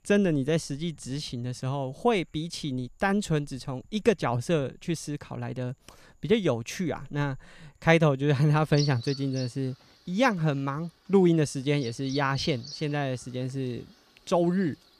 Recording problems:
animal sounds; noticeable; throughout; 15 dB below the speech

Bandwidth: 14.5 kHz